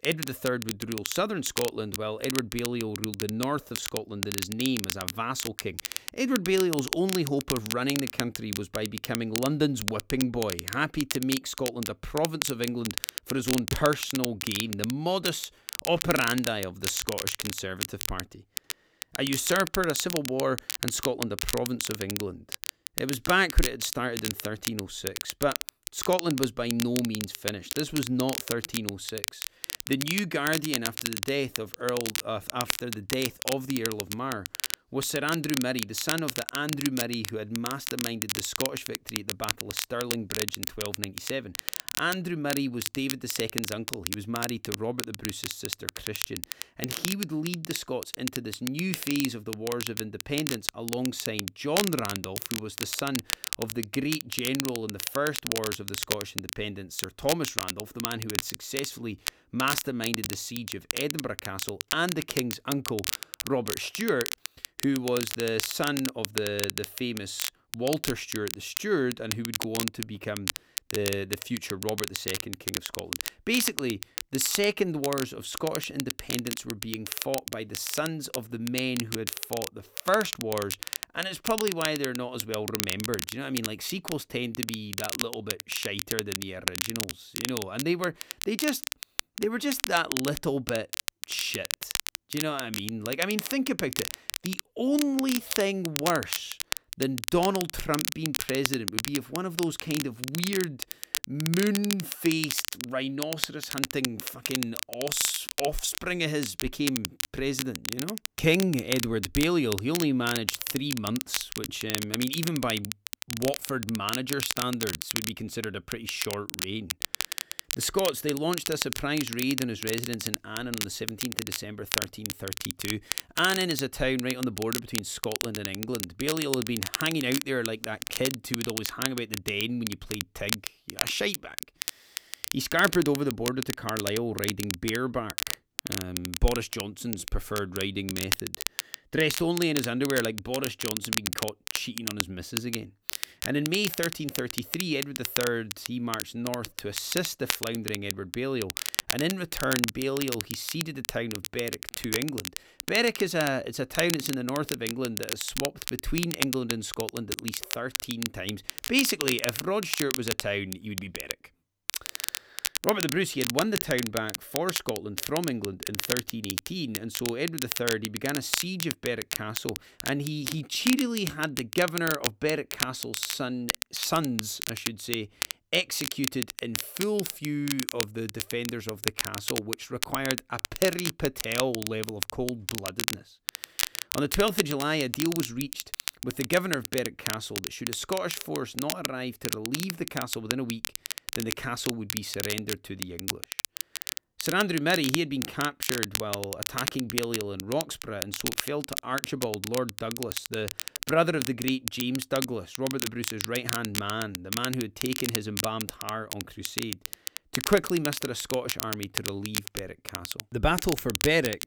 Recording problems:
crackle, like an old record; loud; 3 dB below the speech

